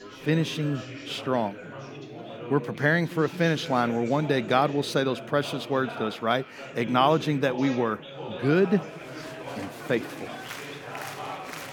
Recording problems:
chatter from many people; noticeable; throughout; 10 dB below the speech

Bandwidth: 18.5 kHz